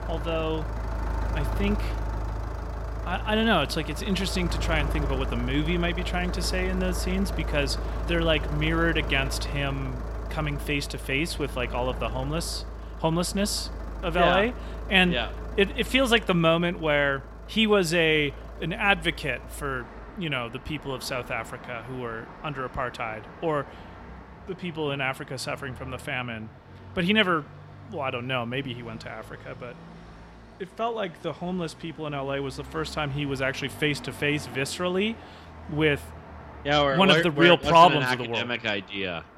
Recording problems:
traffic noise; noticeable; throughout; 10 dB below the speech

